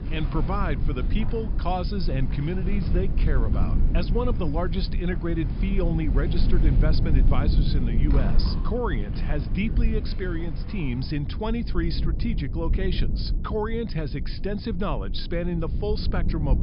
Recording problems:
high frequencies cut off; noticeable; nothing above 5.5 kHz
low rumble; loud; throughout; 9 dB below the speech
rain or running water; noticeable; throughout; 15 dB below the speech

